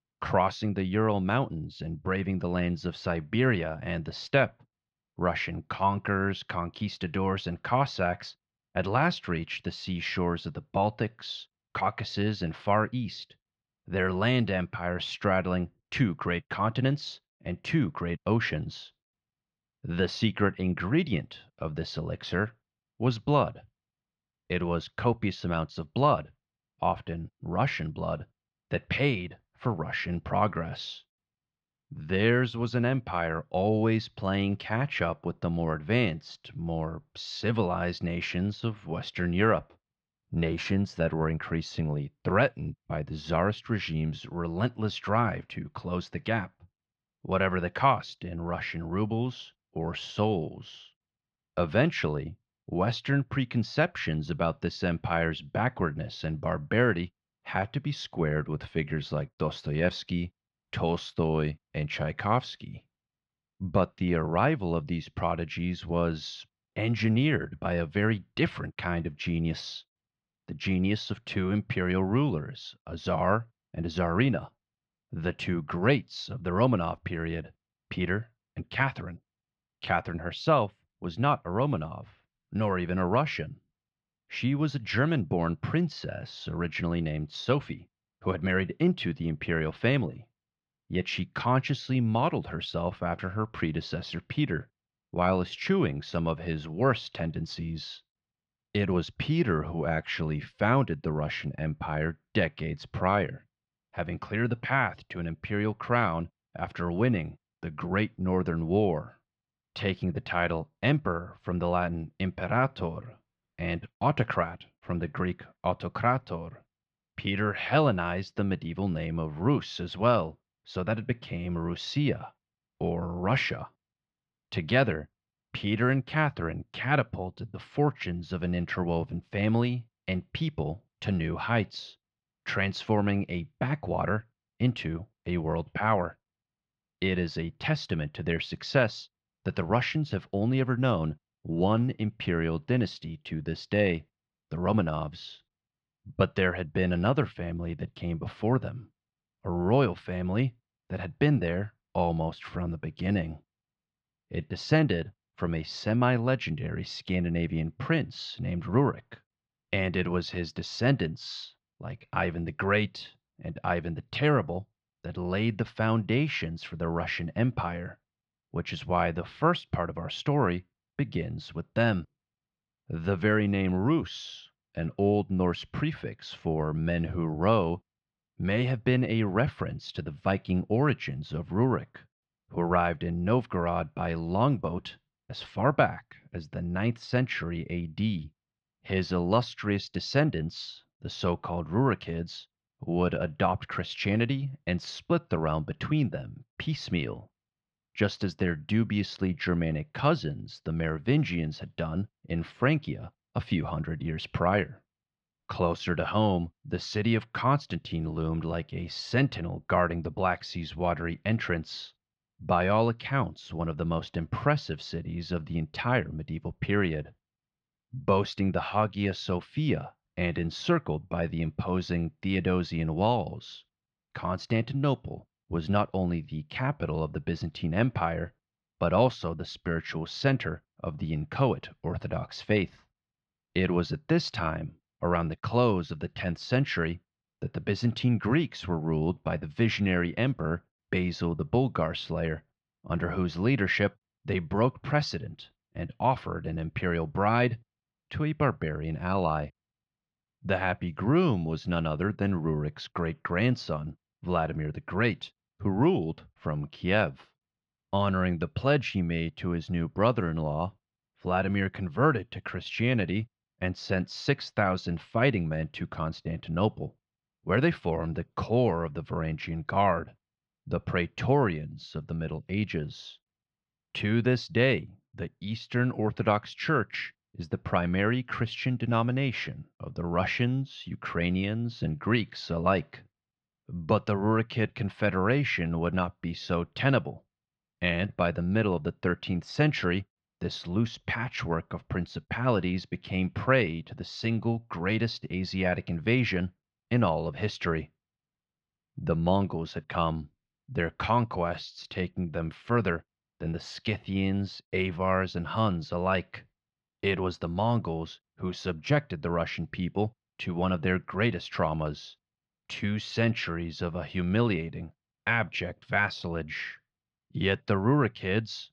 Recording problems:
muffled; very slightly; fading above 4 kHz

